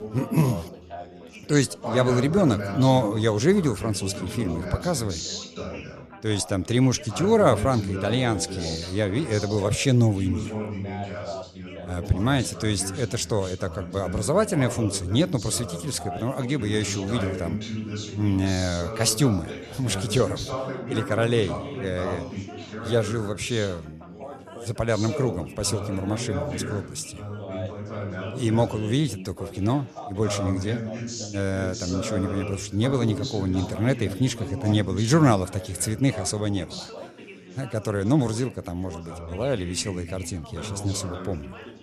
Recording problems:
background chatter; loud; throughout; 4 voices, 9 dB below the speech

